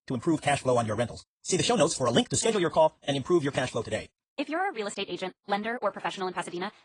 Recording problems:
wrong speed, natural pitch; too fast; 1.8 times normal speed
garbled, watery; slightly; nothing above 8.5 kHz

